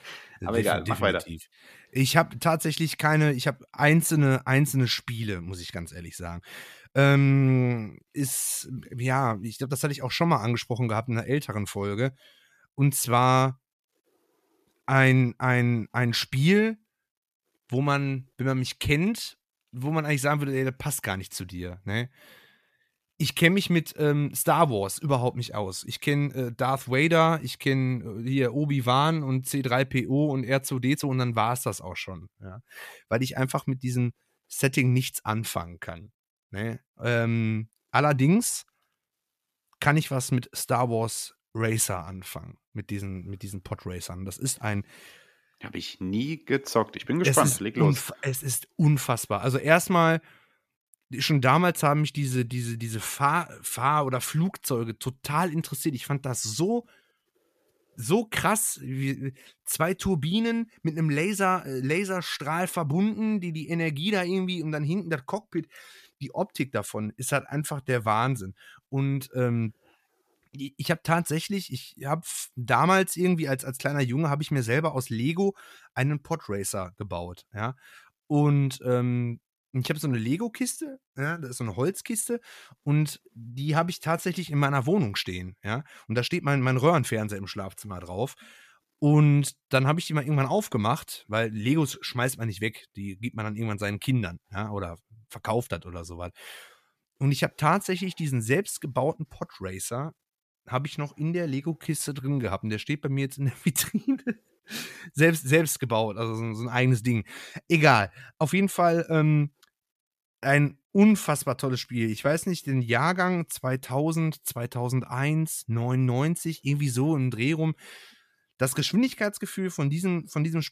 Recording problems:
uneven, jittery; strongly; from 3.5 s to 1:53

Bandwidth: 14.5 kHz